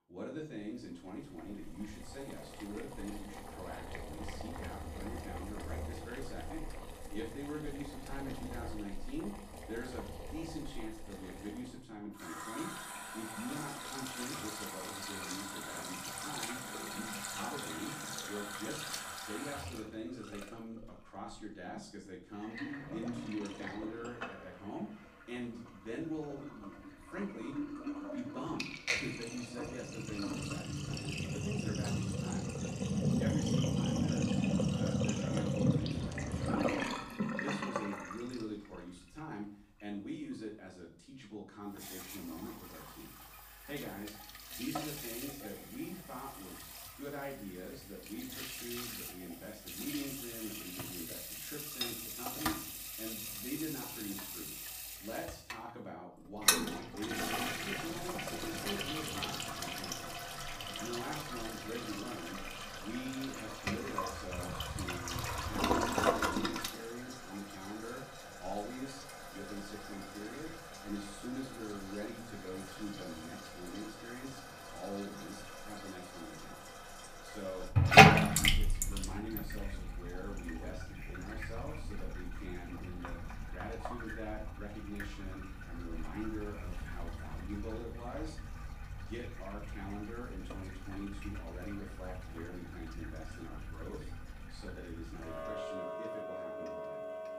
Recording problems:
off-mic speech; far
room echo; slight; dies away in 0.4 s
household noises; very loud; throughout; 9 dB above the speech

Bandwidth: 15 kHz